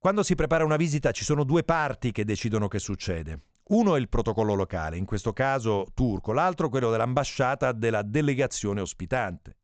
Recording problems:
high frequencies cut off; noticeable; nothing above 8 kHz

